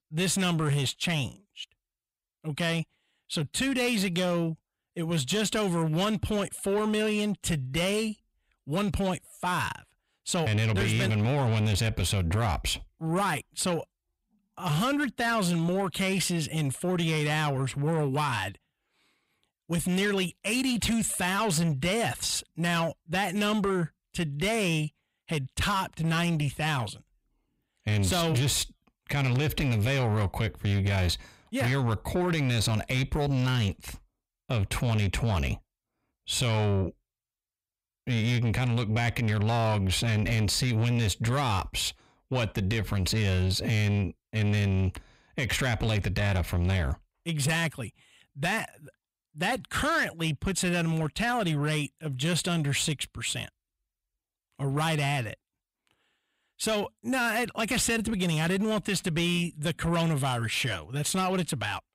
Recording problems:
distortion; slight; 10 dB below the speech

